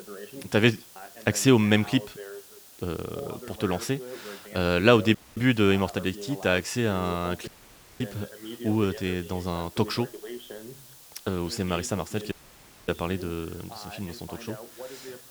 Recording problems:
voice in the background; noticeable; throughout; 15 dB below the speech
hiss; faint; throughout; 20 dB below the speech
audio cutting out; at 5 s, at 7.5 s for 0.5 s and at 12 s for 0.5 s

